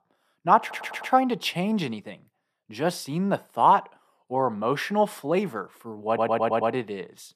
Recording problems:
audio stuttering; at 0.5 s and at 6 s

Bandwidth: 14 kHz